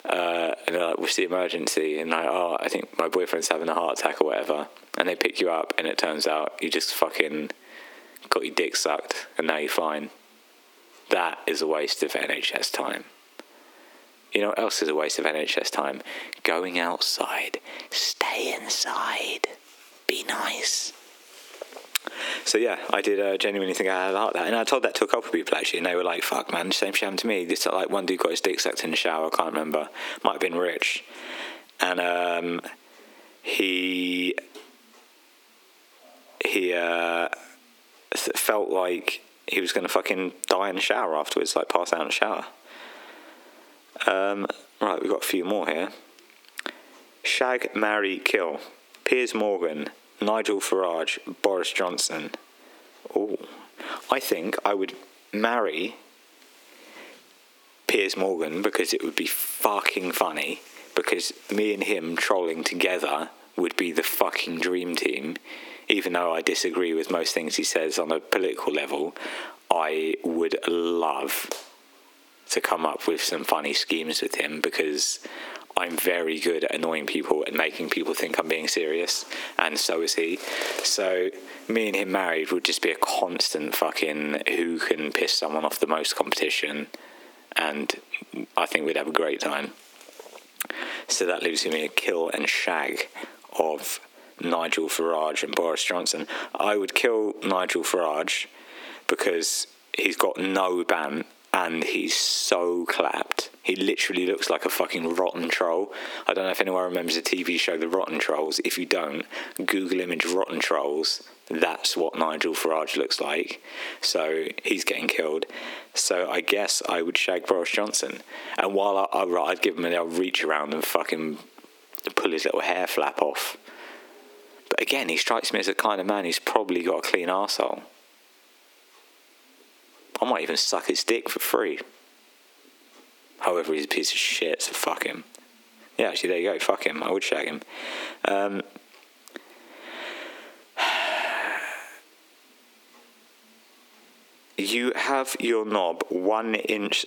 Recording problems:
squashed, flat; heavily
thin; somewhat; fading below 300 Hz

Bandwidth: 18 kHz